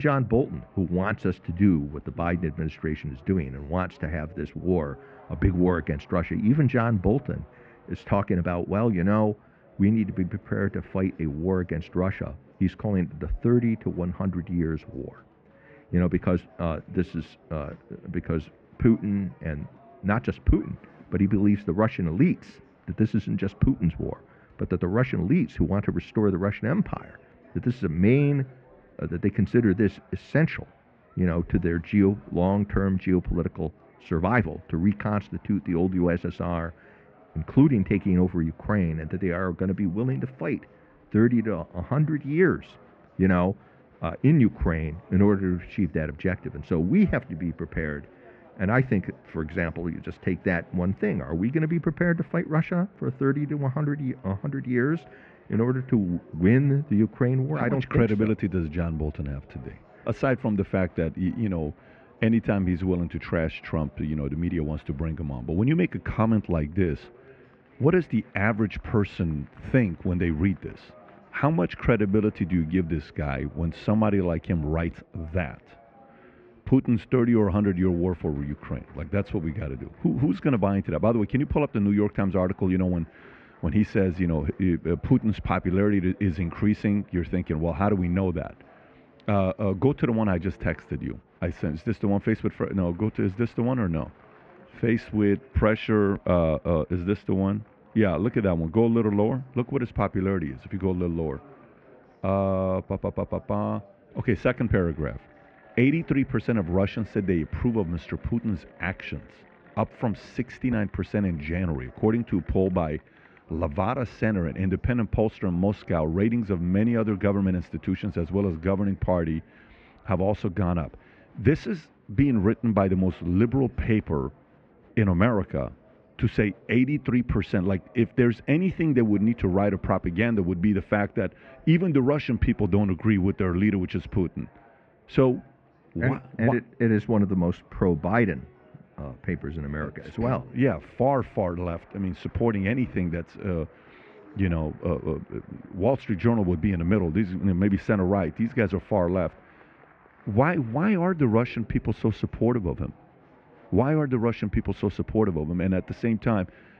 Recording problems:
muffled; very; fading above 2 kHz
murmuring crowd; faint; throughout; 30 dB below the speech
abrupt cut into speech; at the start

